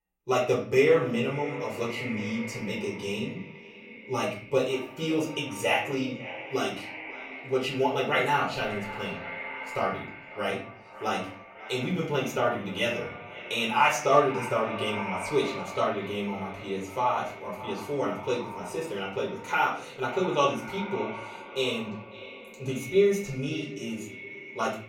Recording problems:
echo of what is said; strong; throughout; 550 ms later, 10 dB below the speech
off-mic speech; far
room echo; slight; dies away in 0.4 s

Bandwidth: 16 kHz